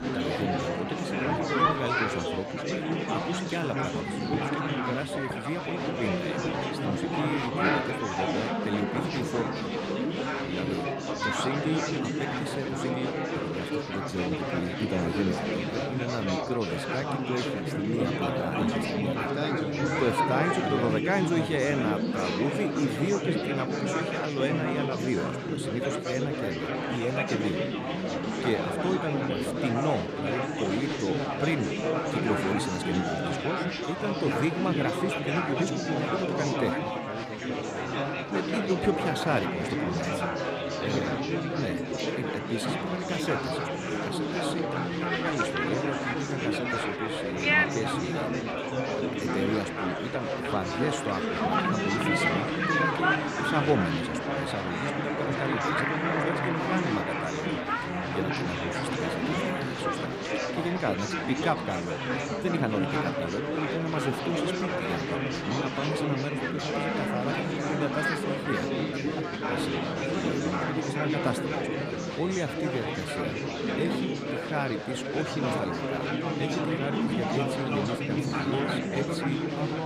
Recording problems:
chatter from many people; very loud; throughout; 3 dB above the speech

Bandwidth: 15 kHz